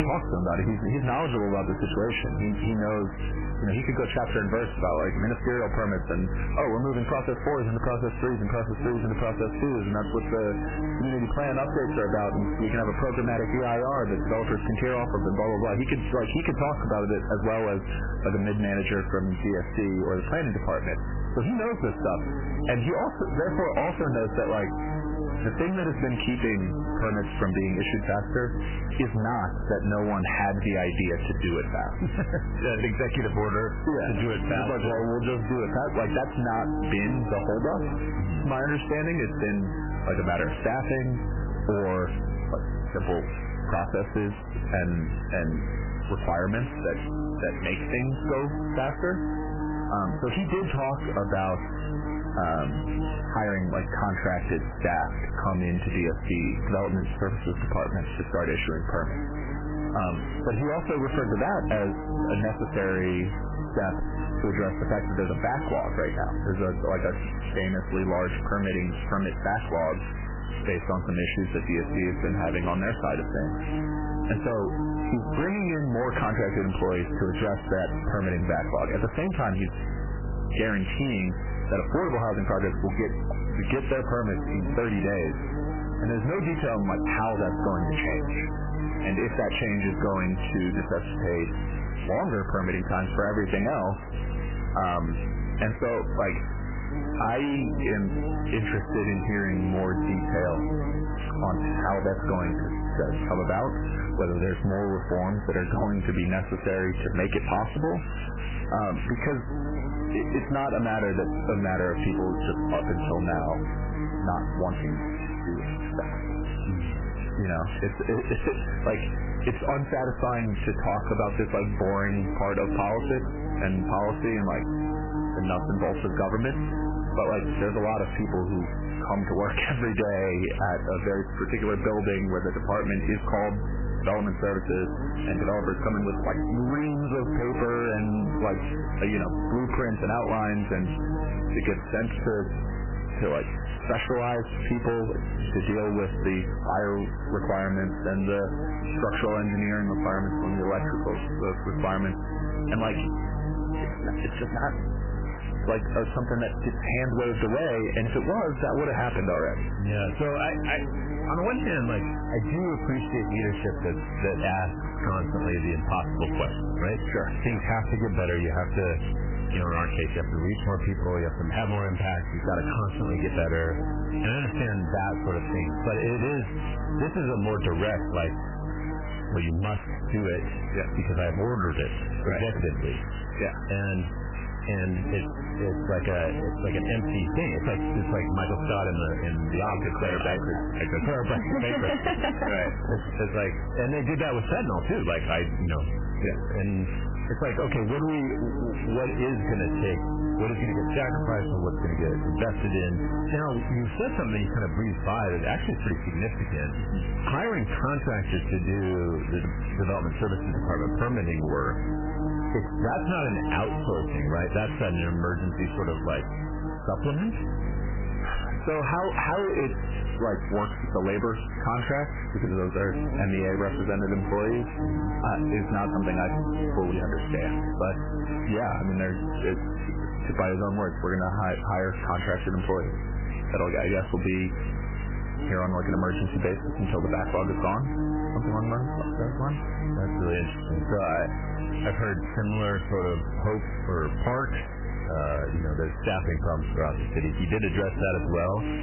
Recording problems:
distortion; heavy; 18% of the sound clipped
garbled, watery; badly; nothing above 3 kHz
squashed, flat; somewhat
electrical hum; loud; throughout; 50 Hz, 10 dB below the speech
hiss; noticeable; throughout; 15 dB below the speech

